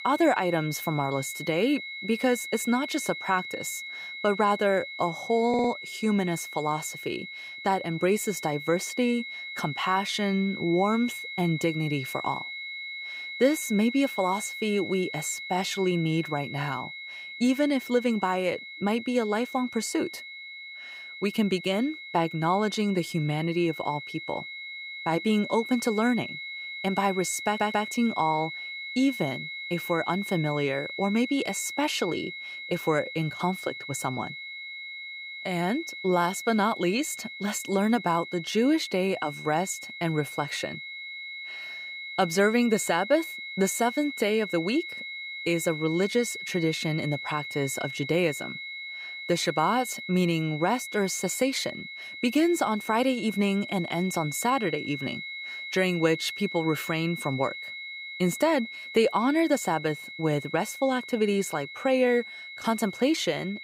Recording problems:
high-pitched whine; loud; throughout; 2 kHz, 9 dB below the speech
audio stuttering; at 5.5 s and at 27 s

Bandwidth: 15.5 kHz